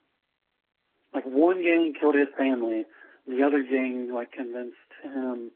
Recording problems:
garbled, watery; badly
phone-call audio

